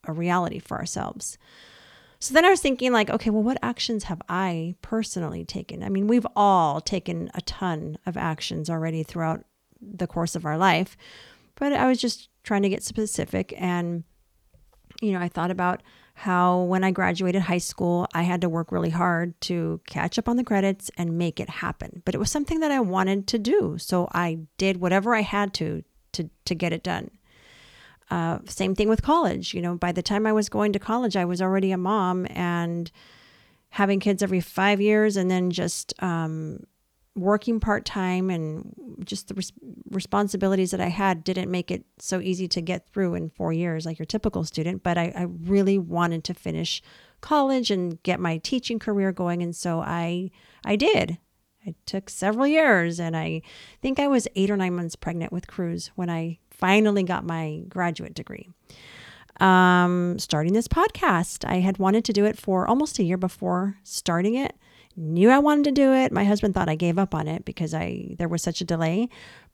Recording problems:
none

